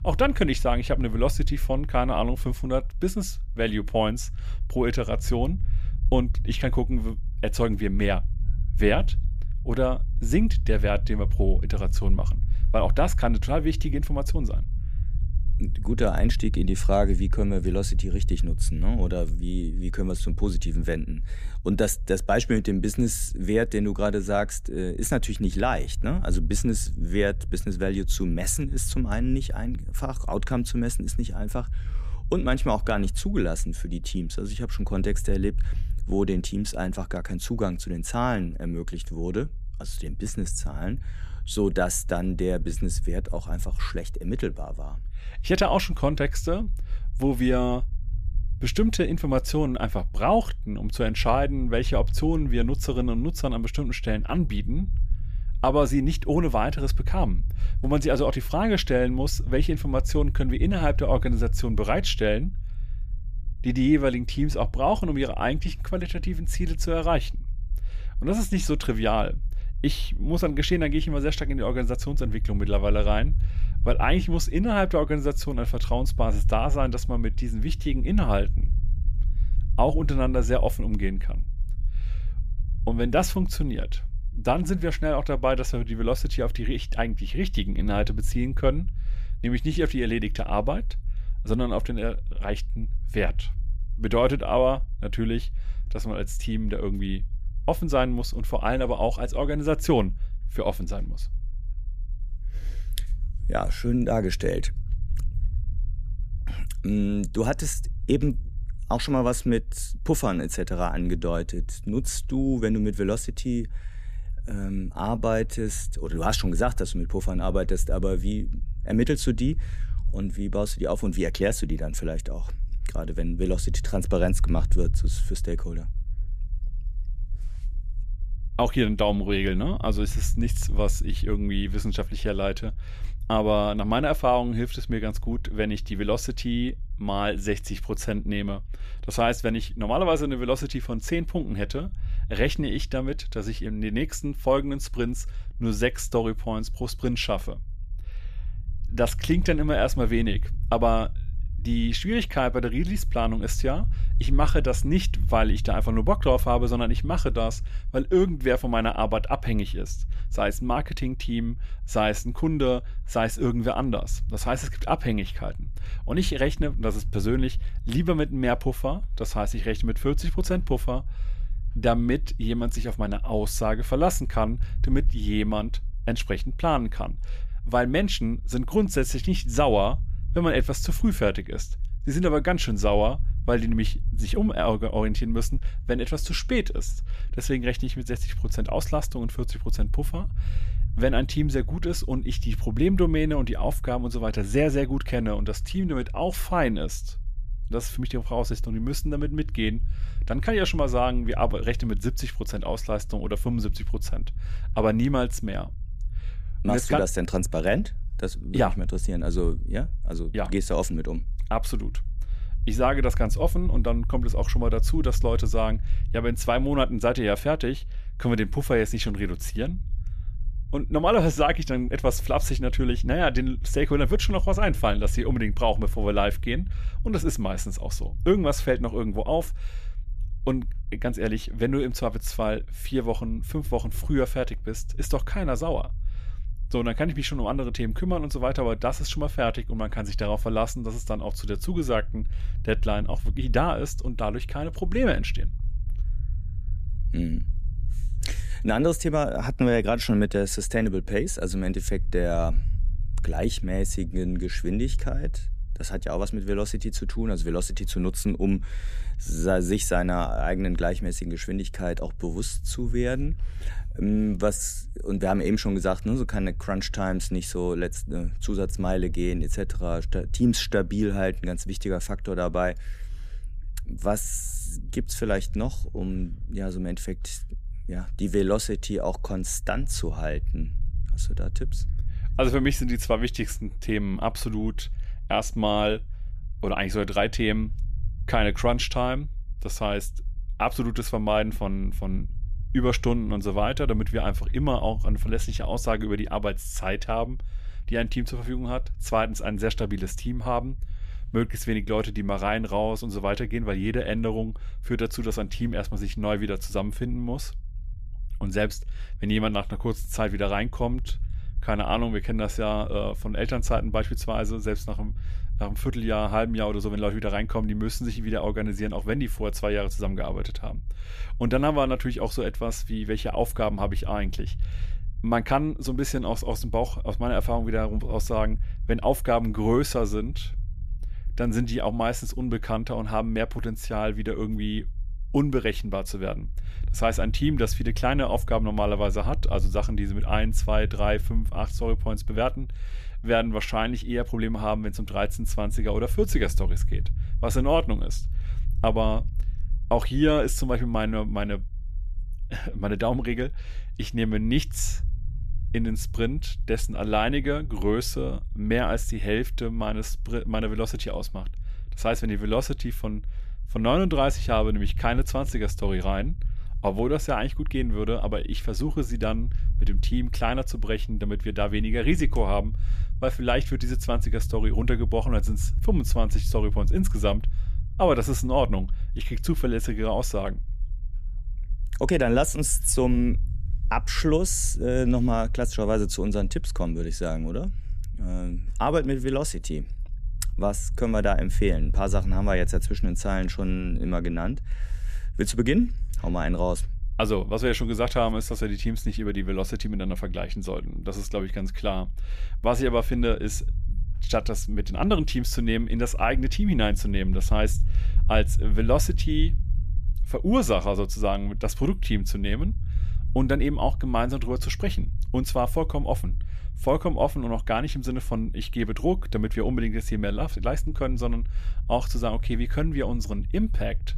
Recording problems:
low rumble; faint; throughout; 25 dB below the speech

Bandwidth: 14.5 kHz